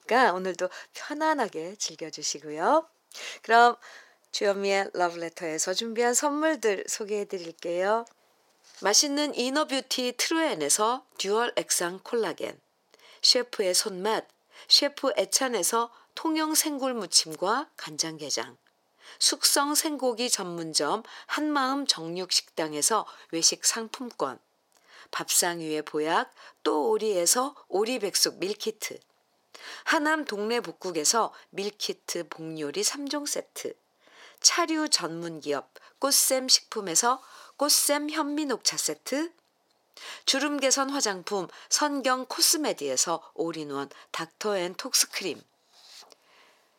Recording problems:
thin; somewhat; fading below 600 Hz

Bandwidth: 16.5 kHz